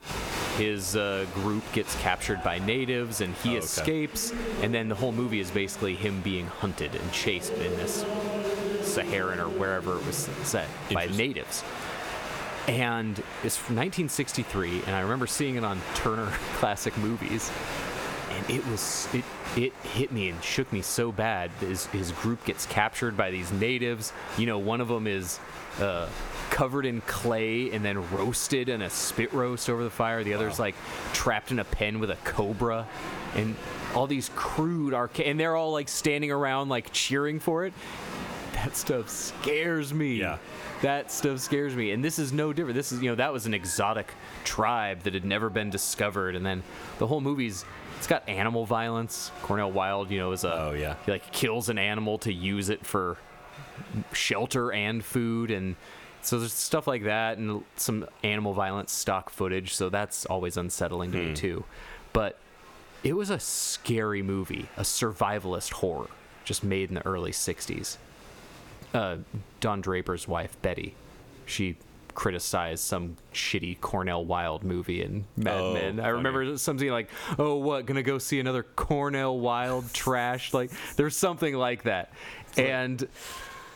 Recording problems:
squashed, flat; heavily, background pumping
crowd noise; loud; throughout; 10 dB below the speech

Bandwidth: 18.5 kHz